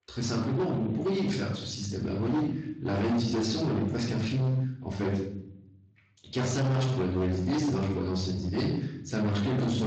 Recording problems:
distortion; heavy; 23% of the sound clipped
off-mic speech; far
room echo; noticeable; dies away in 0.7 s
garbled, watery; slightly
abrupt cut into speech; at the end

